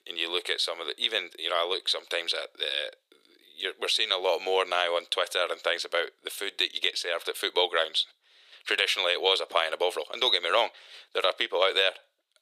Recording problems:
thin; very; fading below 400 Hz

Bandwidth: 15 kHz